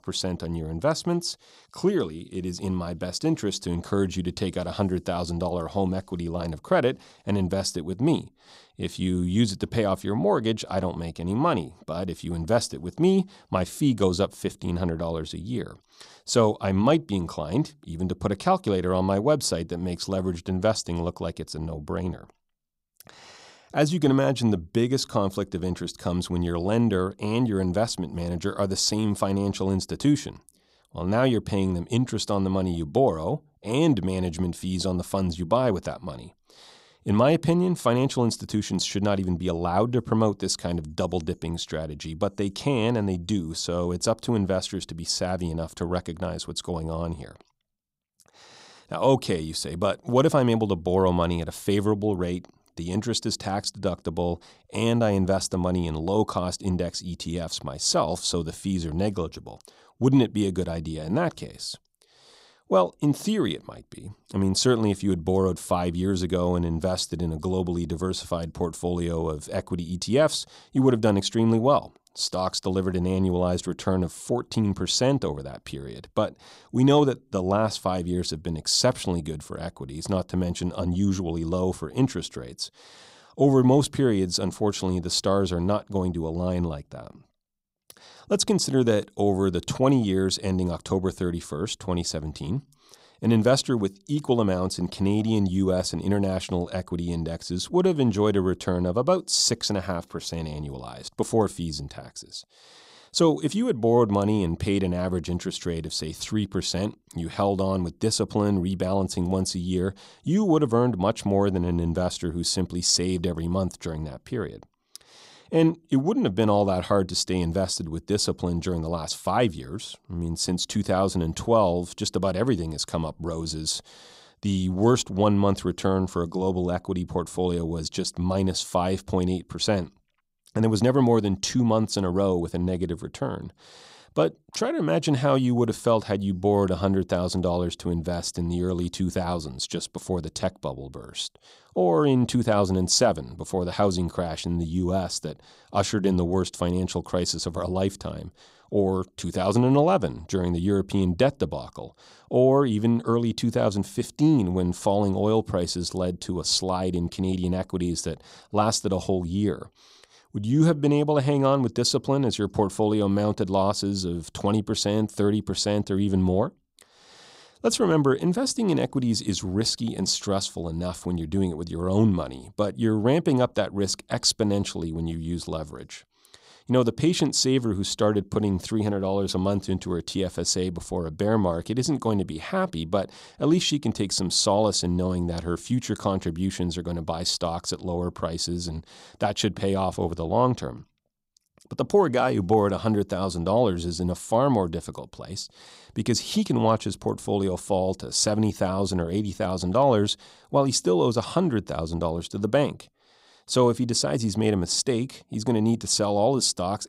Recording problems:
none

